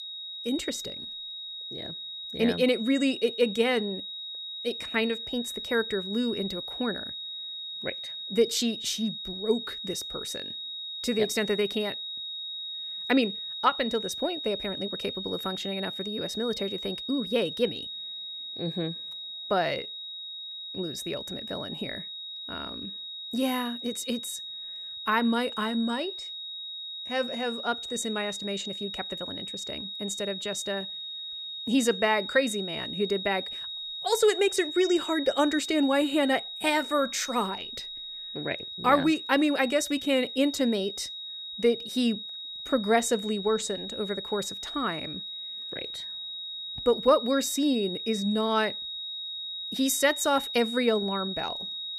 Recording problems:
high-pitched whine; loud; throughout; 4 kHz, 6 dB below the speech

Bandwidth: 15 kHz